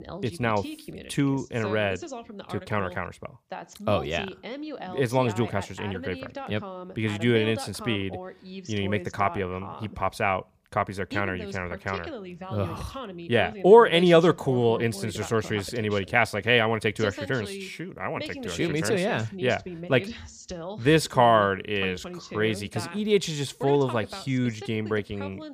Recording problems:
voice in the background; noticeable; throughout; 15 dB below the speech

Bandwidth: 15 kHz